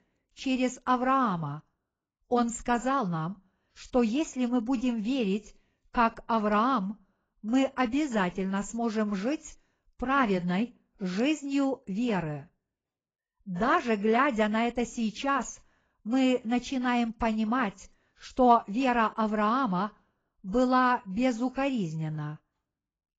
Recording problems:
garbled, watery; badly; nothing above 7.5 kHz

